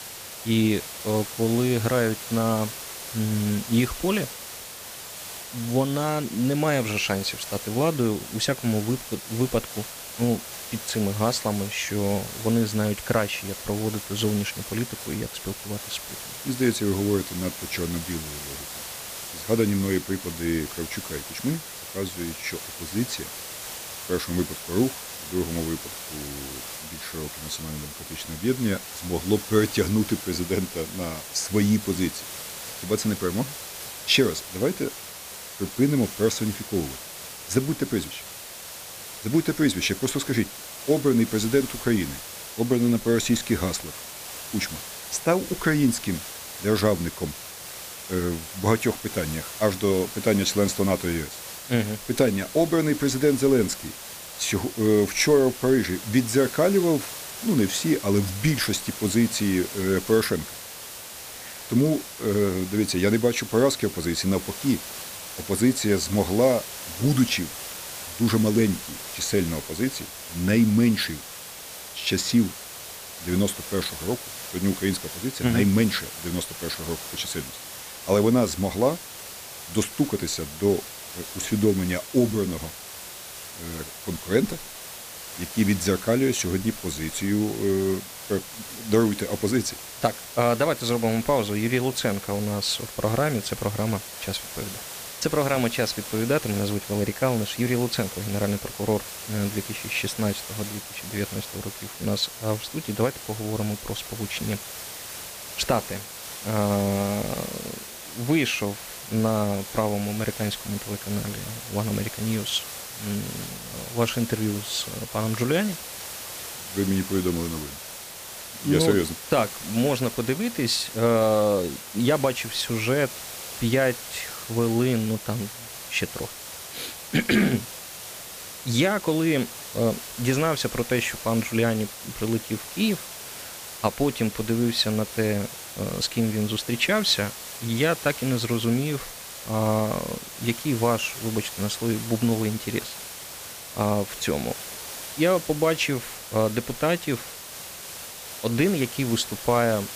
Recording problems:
hiss; loud; throughout; 10 dB below the speech

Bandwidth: 15 kHz